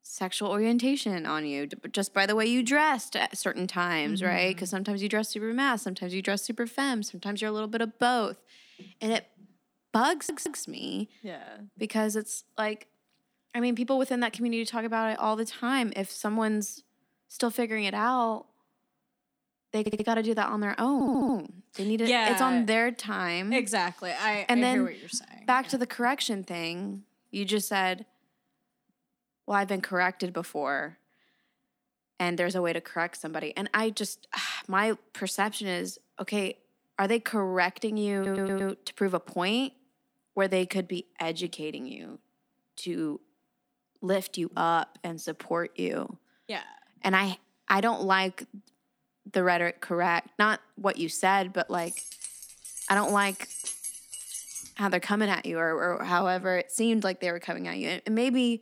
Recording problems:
audio stuttering; 4 times, first at 10 s
jangling keys; noticeable; from 52 to 55 s; peak 5 dB below the speech

